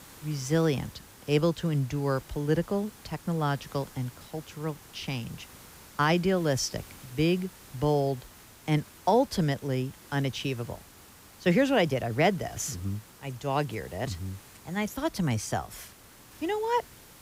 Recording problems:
hiss; faint; throughout; 20 dB below the speech

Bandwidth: 15.5 kHz